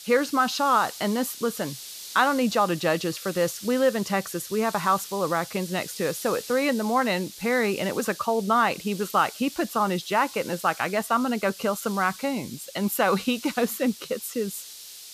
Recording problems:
hiss; noticeable; throughout; 15 dB below the speech

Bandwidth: 14.5 kHz